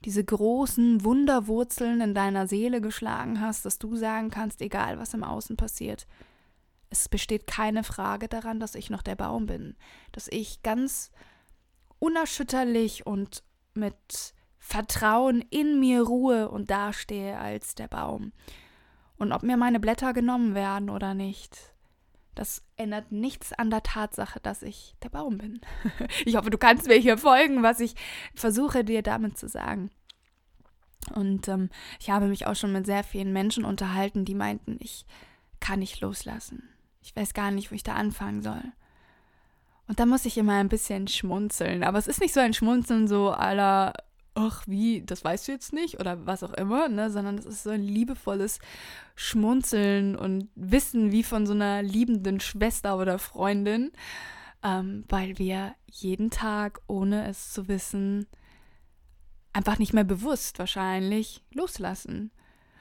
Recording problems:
none

